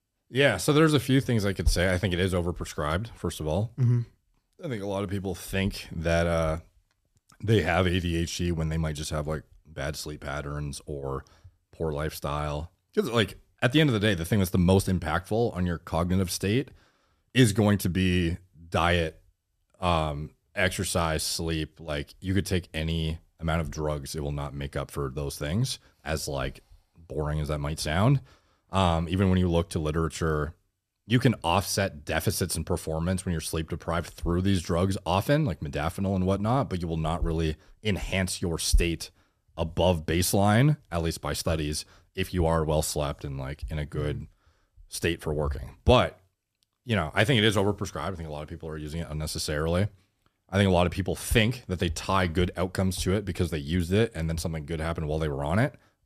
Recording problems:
none

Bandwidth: 14.5 kHz